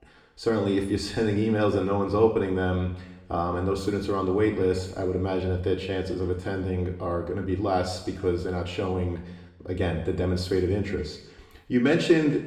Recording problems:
off-mic speech; far
room echo; slight; dies away in 0.8 s

